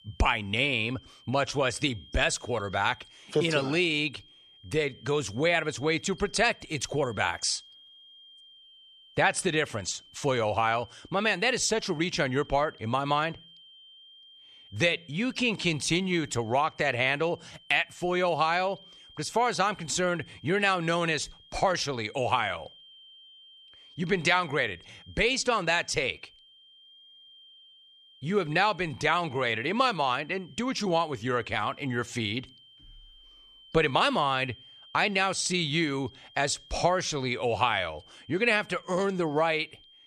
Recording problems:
high-pitched whine; faint; throughout; 3 kHz, 25 dB below the speech

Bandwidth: 13.5 kHz